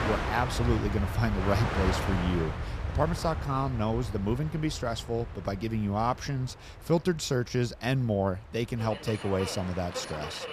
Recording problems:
train or aircraft noise; loud; throughout; 5 dB below the speech

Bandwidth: 14.5 kHz